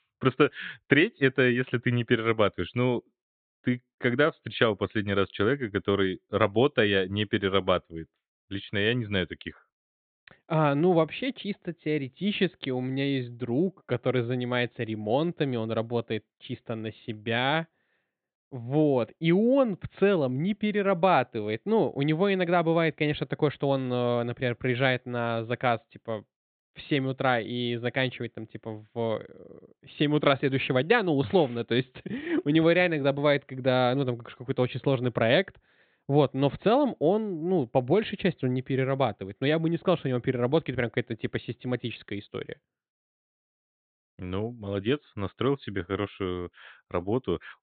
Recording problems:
high frequencies cut off; severe; nothing above 4 kHz

